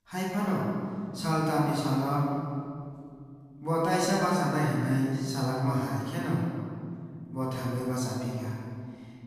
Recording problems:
room echo; strong; dies away in 2.2 s
off-mic speech; far

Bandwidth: 15 kHz